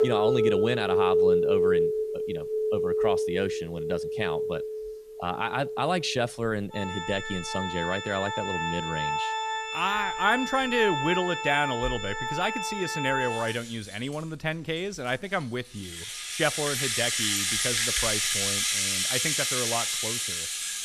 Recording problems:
background music; very loud; throughout; 3 dB above the speech

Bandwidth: 14.5 kHz